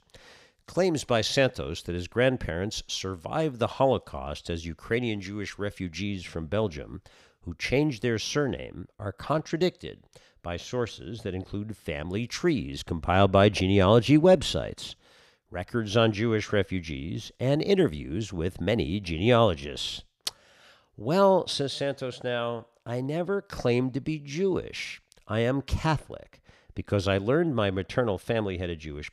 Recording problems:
none

